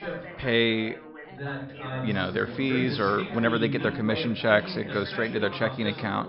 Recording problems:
high frequencies cut off; noticeable; nothing above 5.5 kHz
background chatter; loud; throughout; 4 voices, 9 dB below the speech

